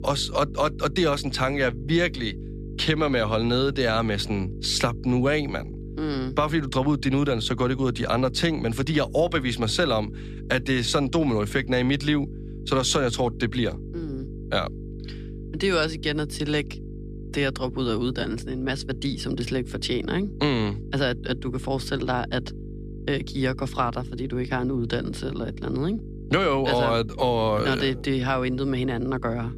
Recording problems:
electrical hum; noticeable; throughout; 50 Hz, 20 dB below the speech

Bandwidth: 14.5 kHz